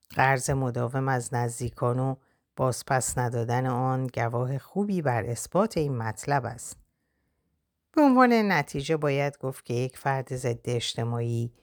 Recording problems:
none

